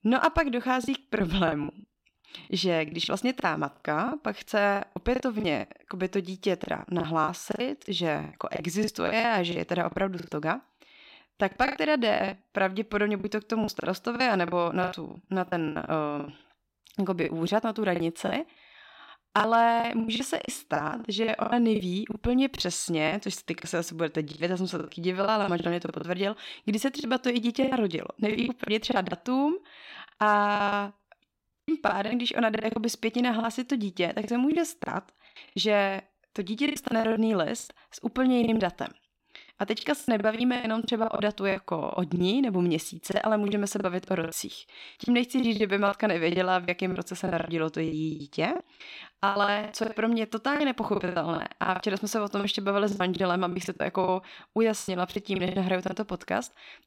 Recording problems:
choppy; very; 14% of the speech affected

